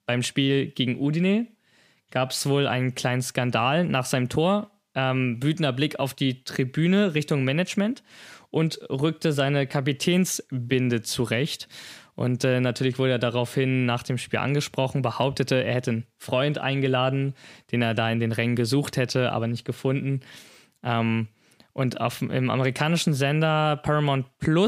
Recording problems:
abrupt cut into speech; at the end

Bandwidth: 15 kHz